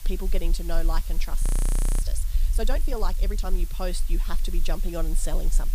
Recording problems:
hiss; loud; throughout; 10 dB below the speech
low rumble; noticeable; throughout; 15 dB below the speech
audio freezing; at 1.5 s for 0.5 s

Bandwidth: 15 kHz